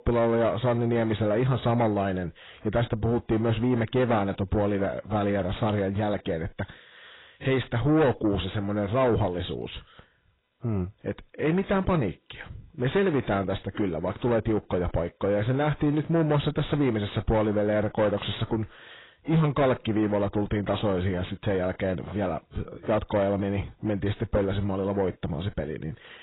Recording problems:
garbled, watery; badly; nothing above 4 kHz
distortion; slight; 10 dB below the speech

